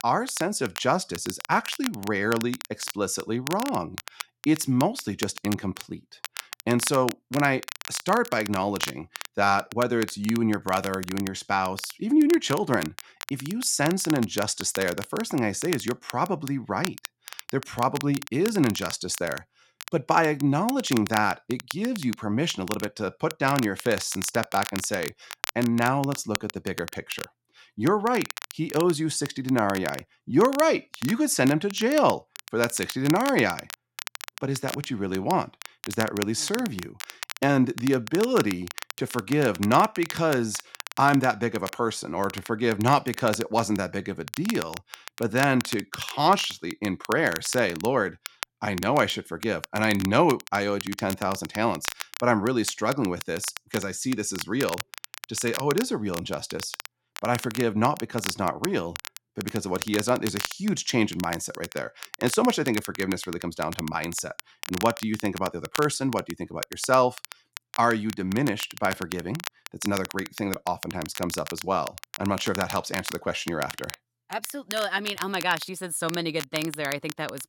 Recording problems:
crackle, like an old record; noticeable; 10 dB below the speech

